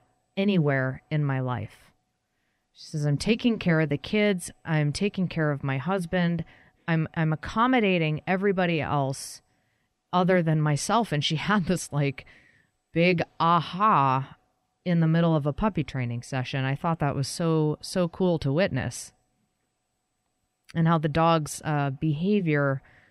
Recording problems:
none

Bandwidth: 15.5 kHz